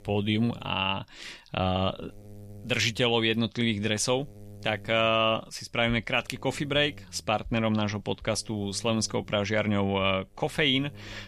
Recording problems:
electrical hum; very faint; throughout; 50 Hz, 30 dB below the speech

